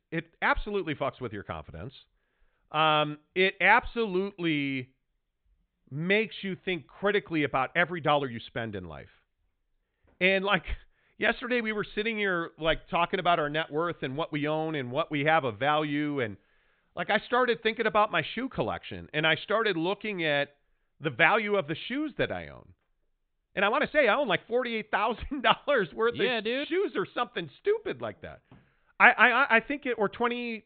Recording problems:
high frequencies cut off; severe; nothing above 4 kHz
uneven, jittery; strongly; from 6 to 24 s

